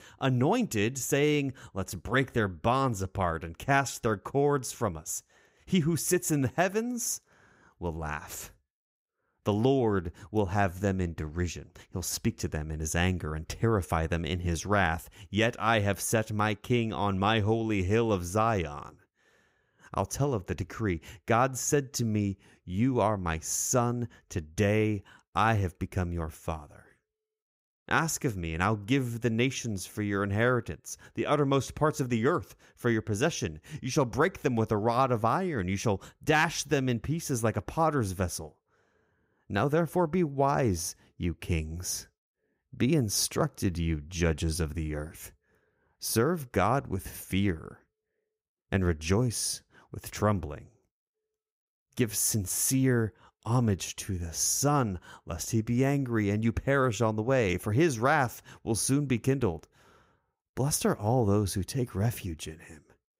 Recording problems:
none

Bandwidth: 15.5 kHz